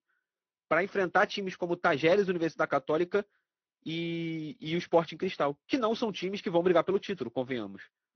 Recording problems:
garbled, watery; slightly; nothing above 6 kHz
high frequencies cut off; slight

